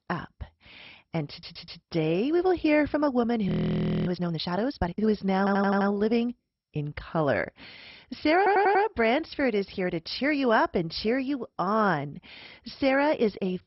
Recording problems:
garbled, watery; badly; nothing above 5.5 kHz
audio stuttering; at 1.5 s, at 5.5 s and at 8.5 s
audio freezing; at 3.5 s for 0.5 s

